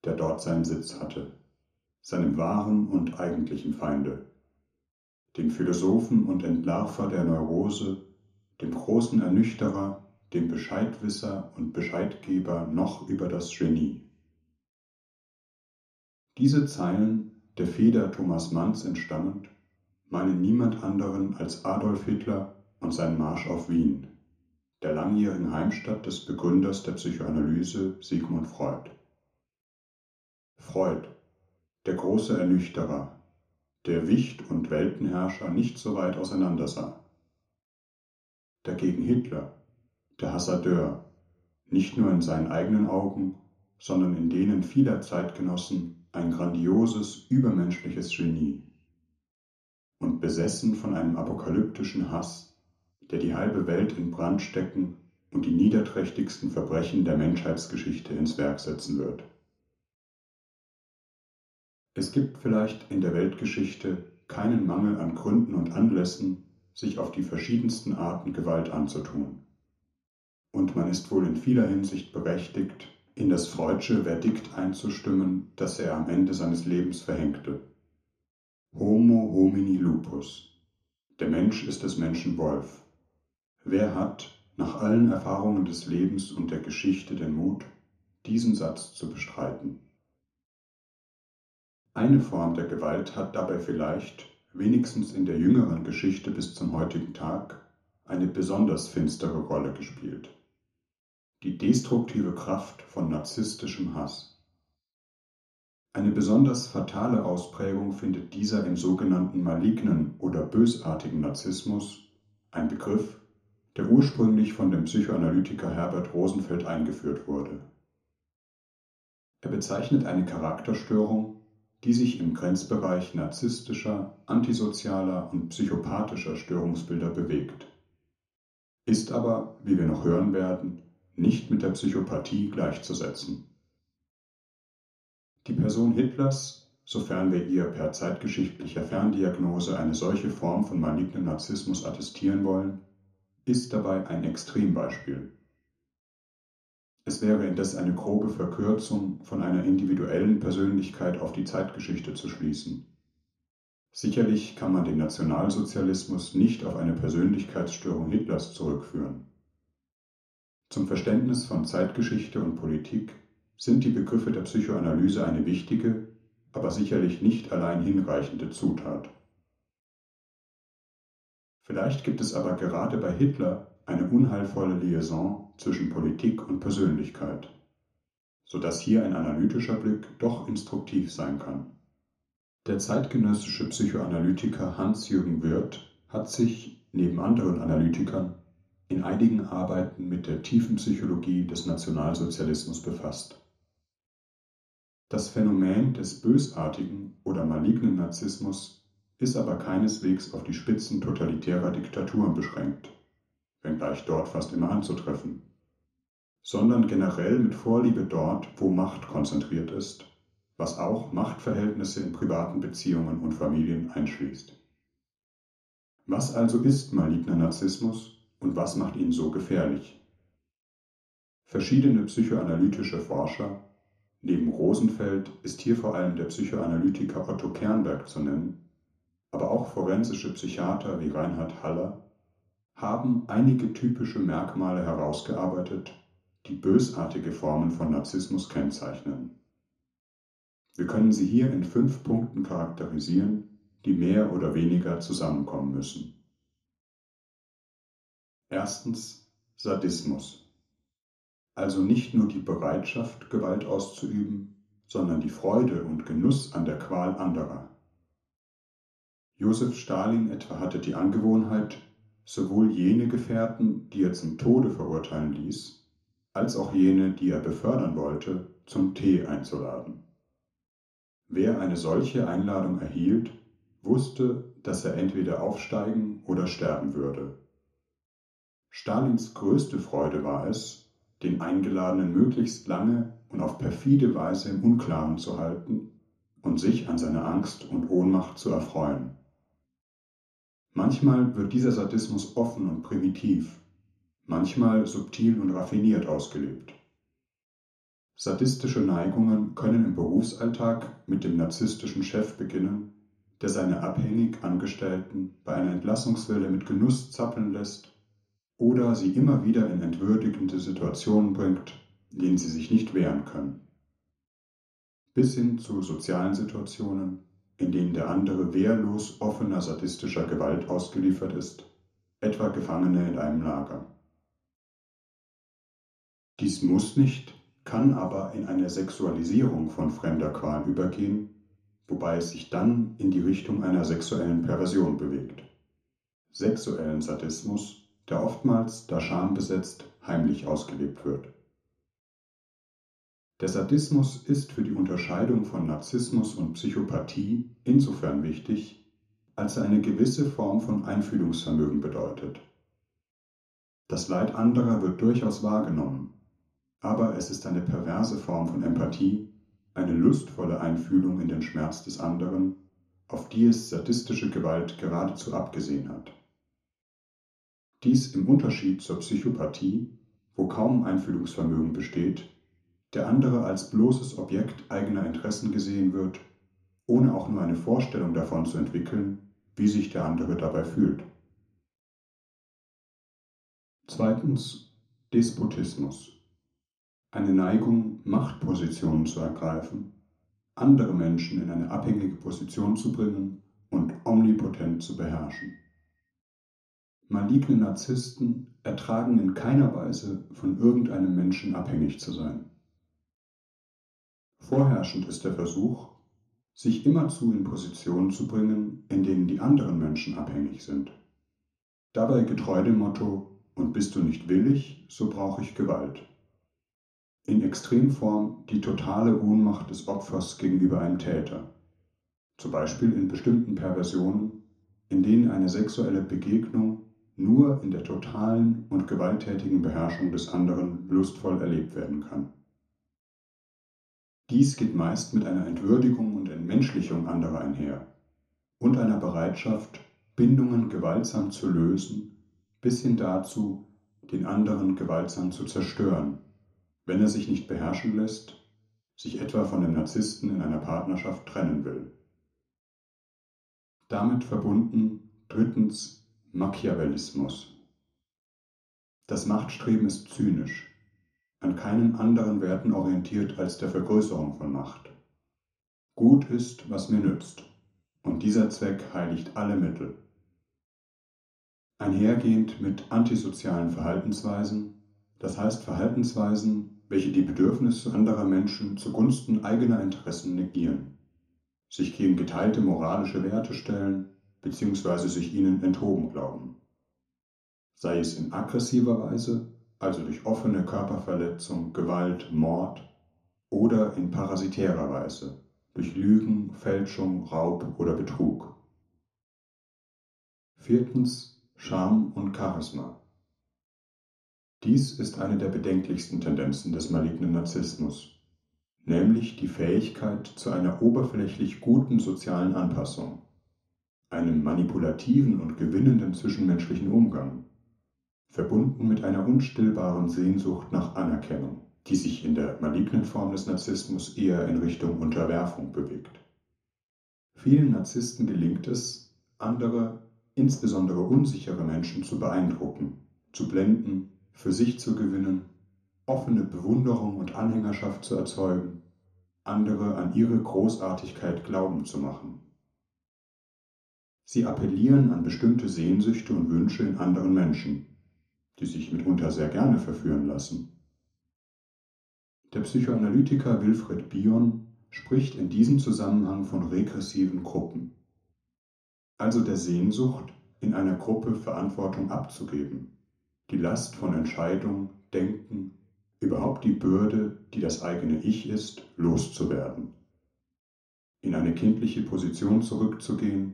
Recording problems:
off-mic speech; far
room echo; slight; dies away in 0.7 s

